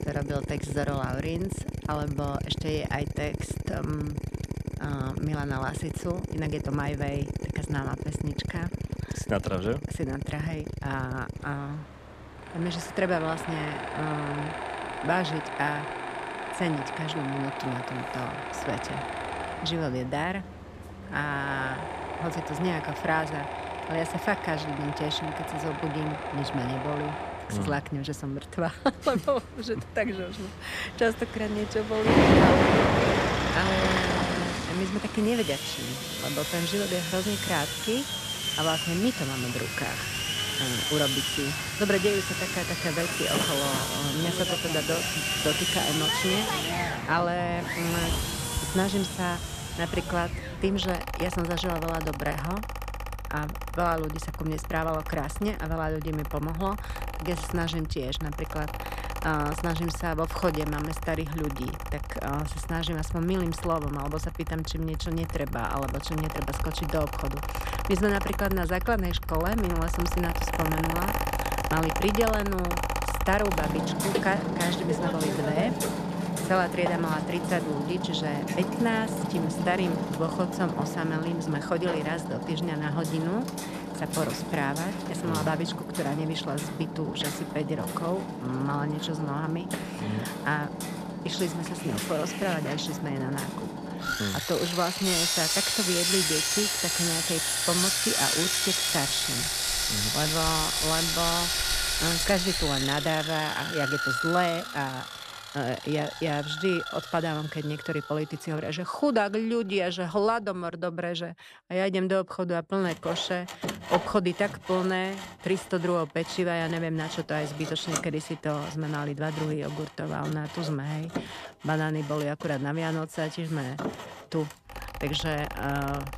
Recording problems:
machinery noise; very loud; throughout; as loud as the speech

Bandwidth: 14.5 kHz